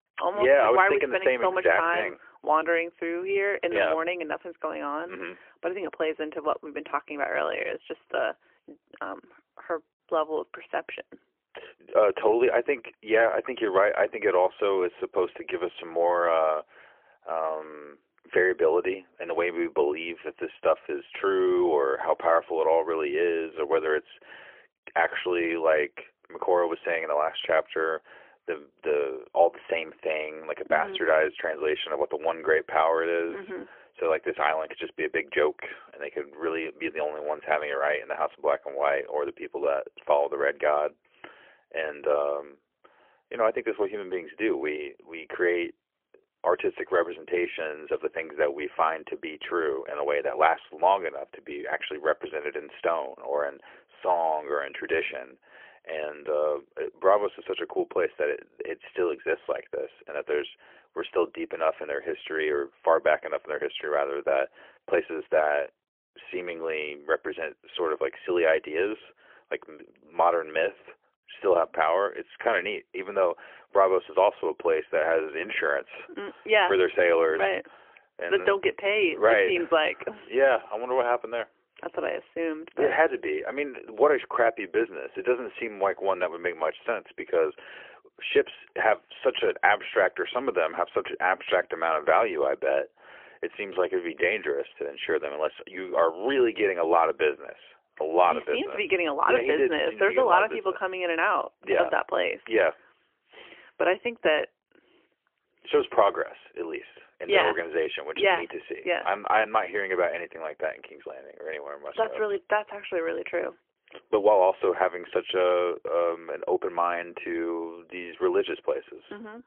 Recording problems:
phone-call audio; poor line; nothing above 3.5 kHz

